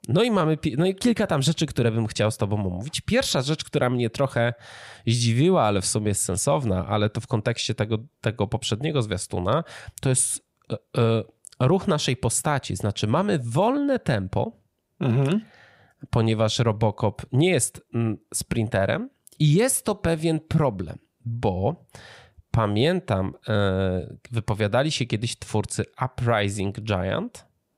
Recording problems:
none

